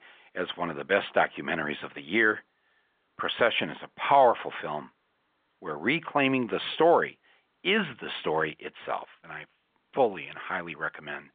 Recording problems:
phone-call audio

